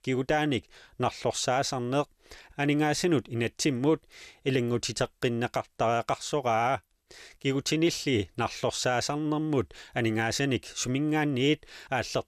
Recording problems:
none

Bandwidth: 14 kHz